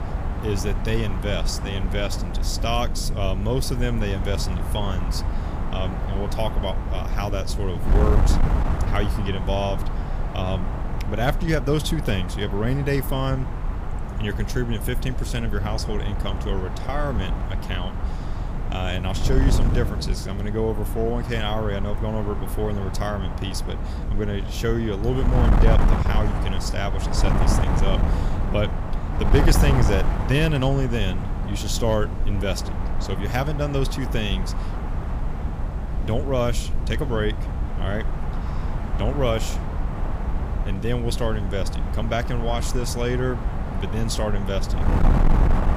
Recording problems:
wind noise on the microphone; heavy; 5 dB below the speech

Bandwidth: 15 kHz